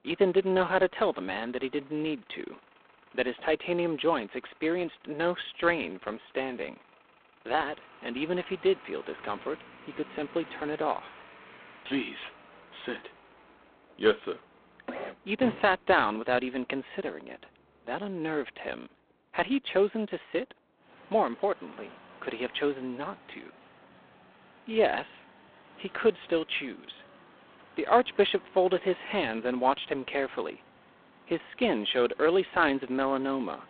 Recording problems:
phone-call audio; poor line; nothing above 3.5 kHz
traffic noise; faint; throughout; 25 dB below the speech

